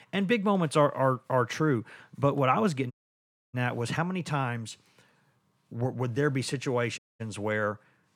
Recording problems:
audio cutting out; at 3 s for 0.5 s and at 7 s

